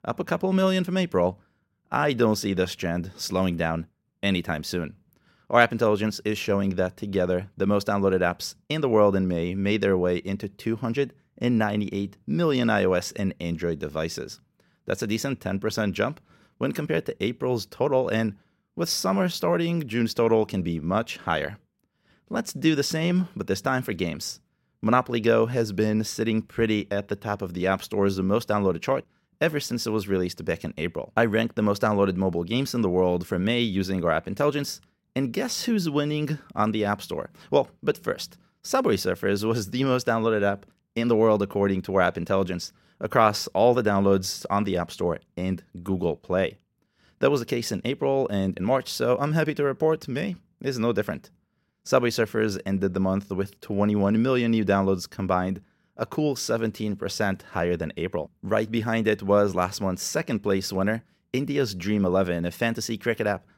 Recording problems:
none

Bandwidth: 16 kHz